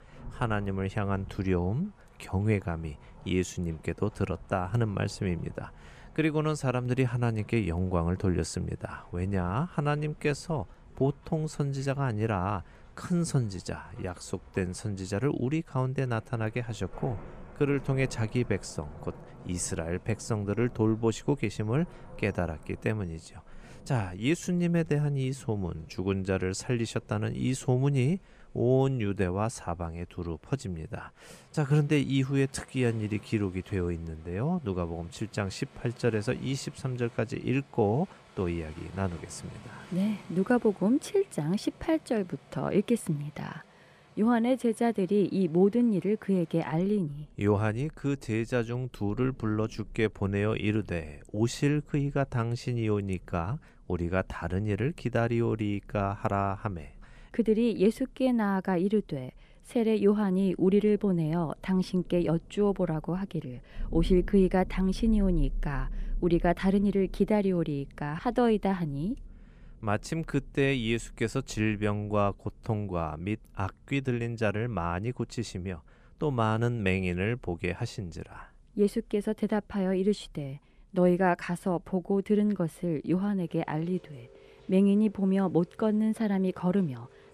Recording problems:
rain or running water; faint; throughout; 20 dB below the speech

